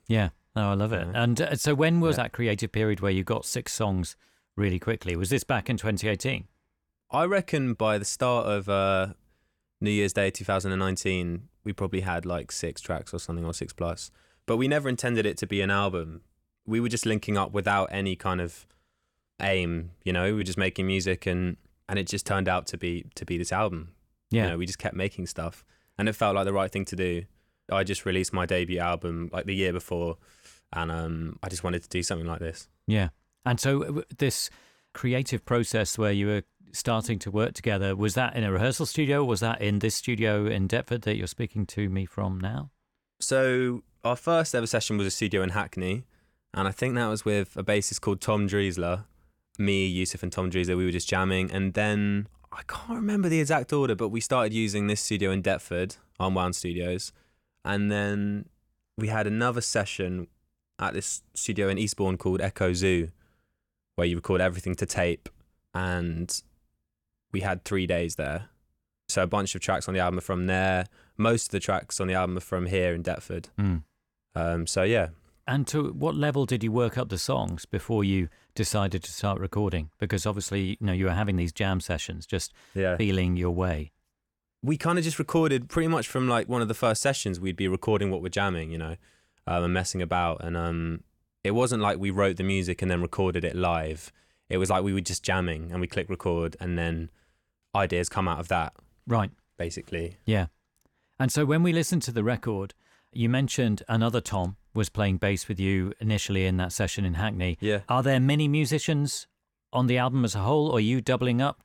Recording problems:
none

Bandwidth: 17.5 kHz